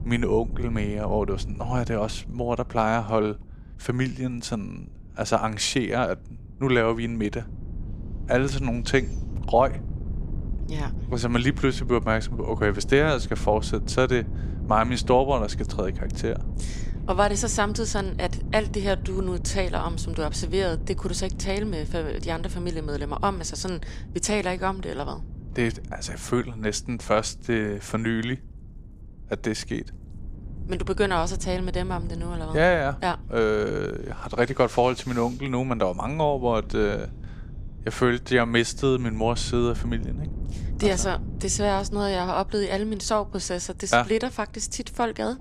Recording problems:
wind noise on the microphone; occasional gusts; 20 dB below the speech

